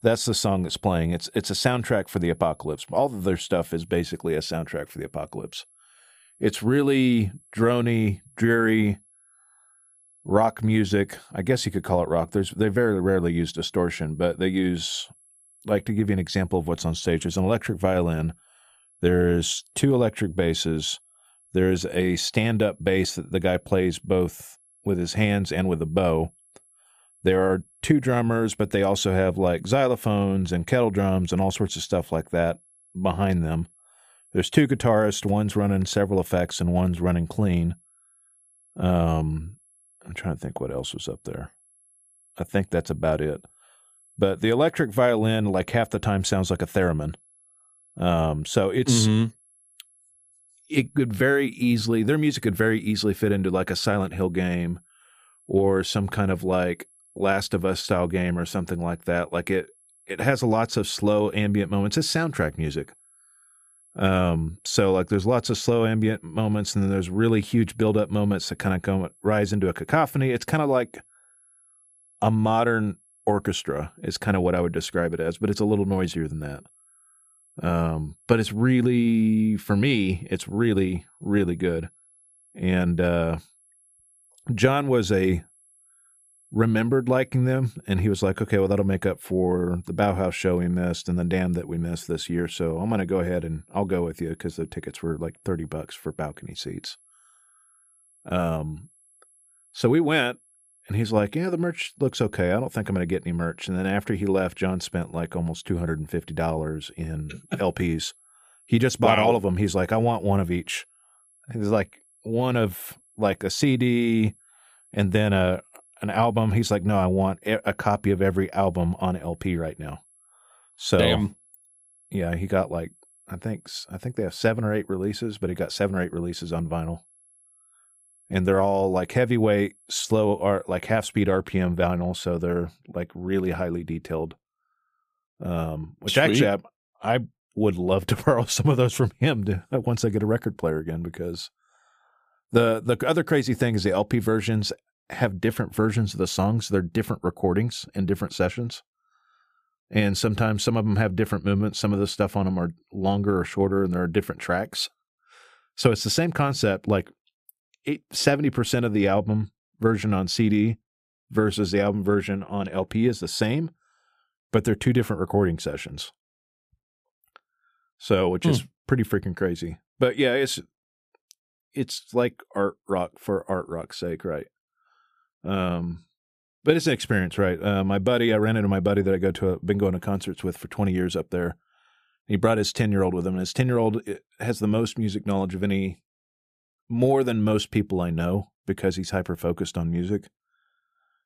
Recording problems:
high-pitched whine; faint; until 2:11; 11 kHz, 30 dB below the speech

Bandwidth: 14.5 kHz